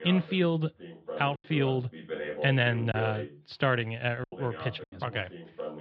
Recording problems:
muffled; slightly; fading above 4 kHz
voice in the background; noticeable; throughout; 10 dB below the speech
choppy; very; at 3 s and at 4 s; 6% of the speech affected

